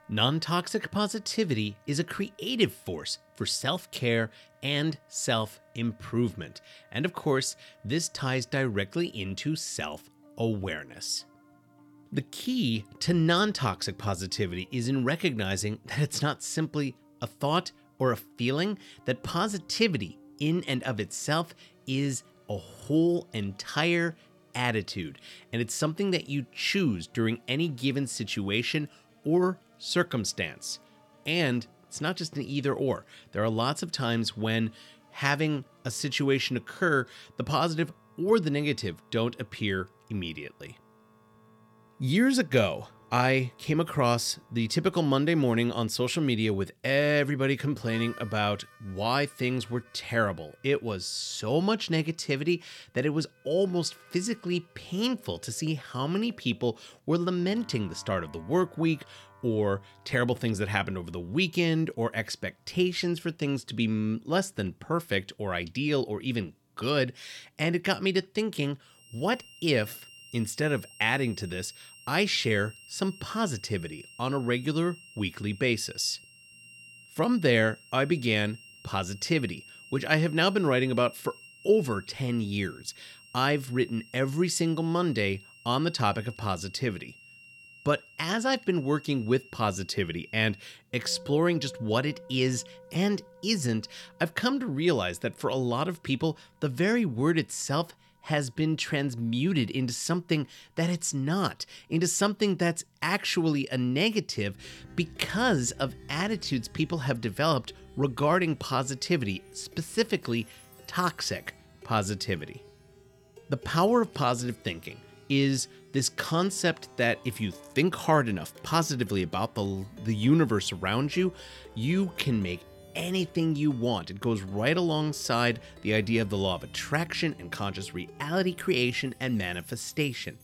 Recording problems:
background music; faint; throughout; 25 dB below the speech

